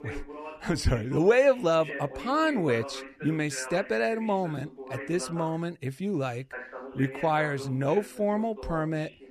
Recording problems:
voice in the background; noticeable; throughout; 15 dB below the speech

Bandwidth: 14.5 kHz